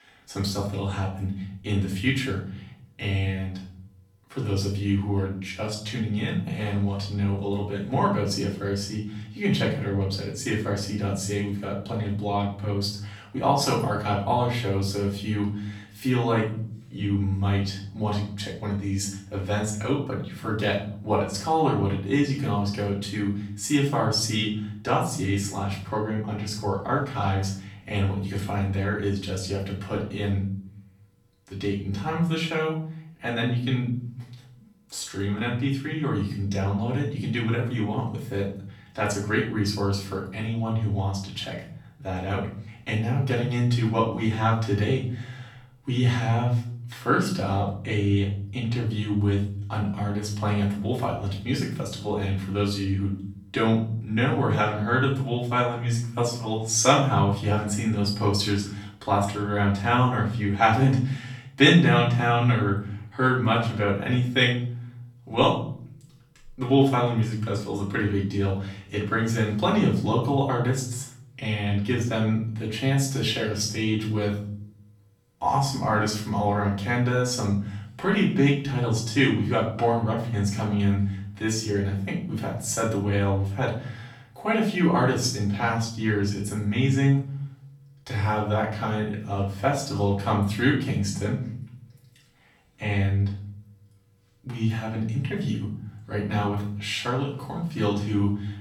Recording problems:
off-mic speech; far
room echo; noticeable; dies away in 0.7 s

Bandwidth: 18.5 kHz